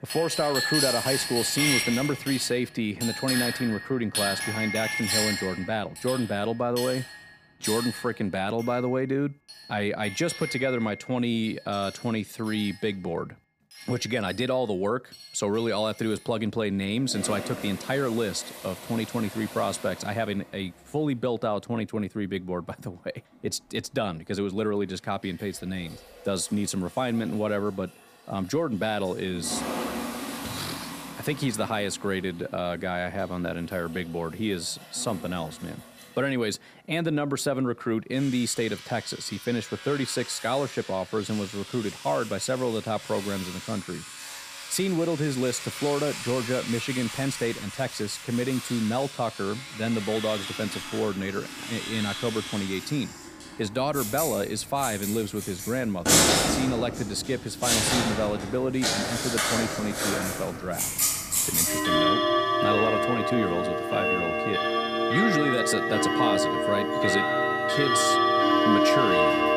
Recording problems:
household noises; very loud; throughout; 2 dB above the speech

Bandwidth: 15 kHz